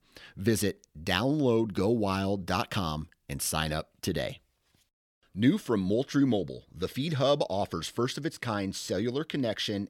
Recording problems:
none

